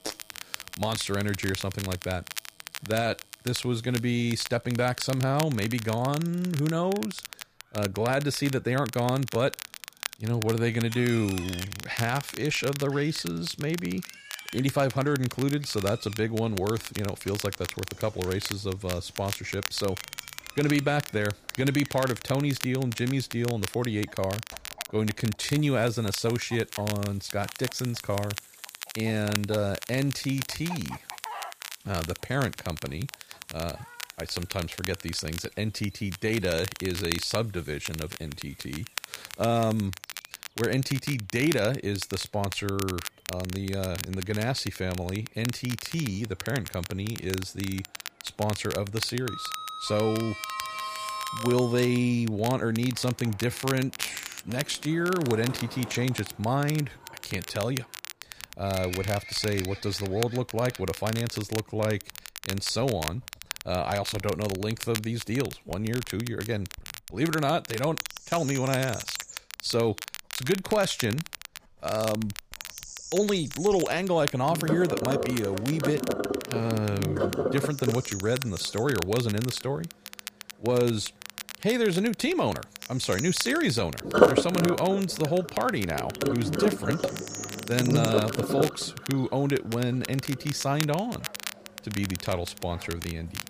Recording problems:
household noises; loud; throughout; 3 dB below the speech
crackle, like an old record; loud; 10 dB below the speech
animal sounds; noticeable; throughout; 15 dB below the speech

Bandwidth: 15 kHz